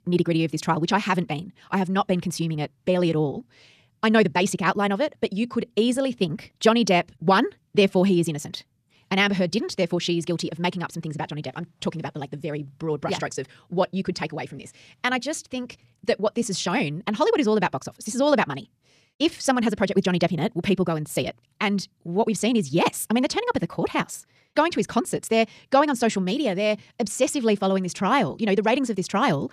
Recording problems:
wrong speed, natural pitch; too fast; 1.7 times normal speed

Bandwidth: 14.5 kHz